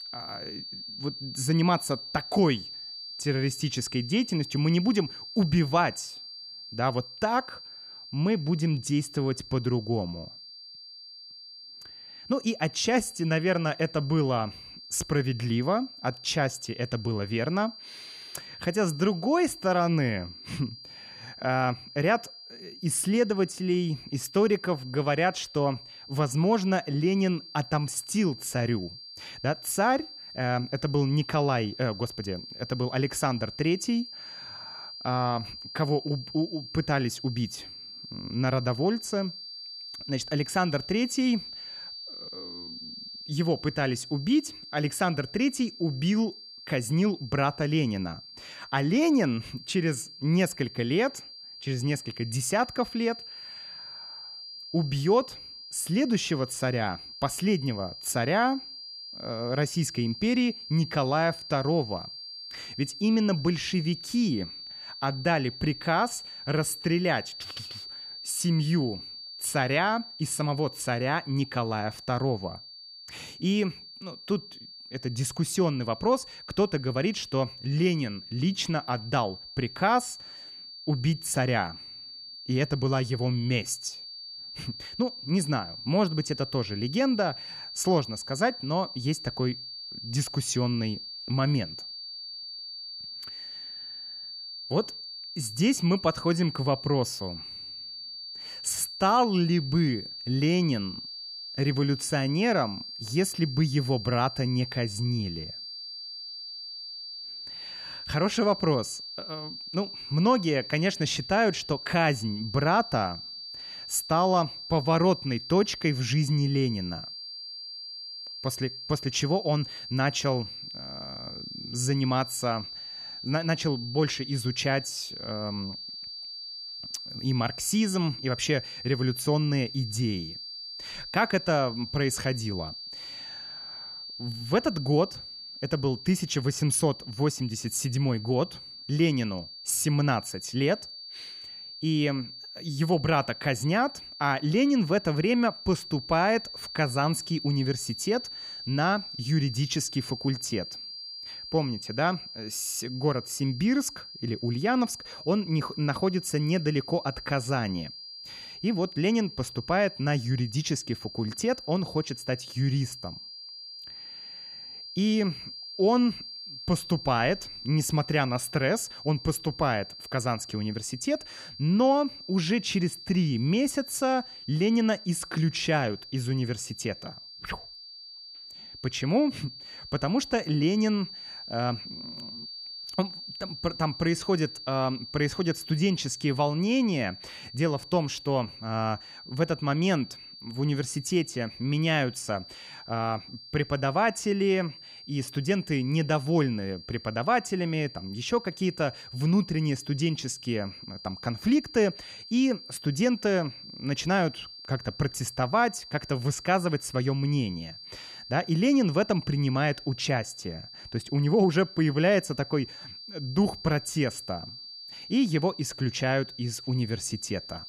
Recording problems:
high-pitched whine; noticeable; throughout; 4.5 kHz, 10 dB below the speech

